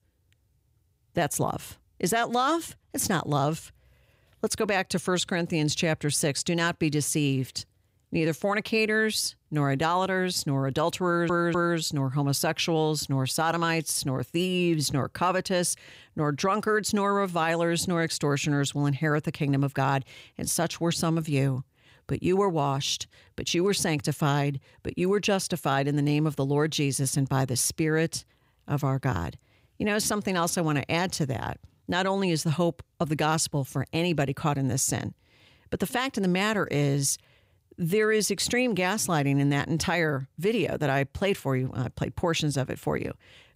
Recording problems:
audio stuttering; at 11 s

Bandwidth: 15.5 kHz